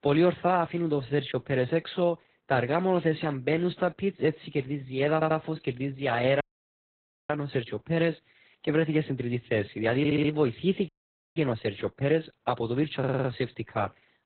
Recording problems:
garbled, watery; badly; nothing above 4 kHz
audio stuttering; at 5 s, at 10 s and at 13 s
audio cutting out; at 6.5 s for 1 s and at 11 s

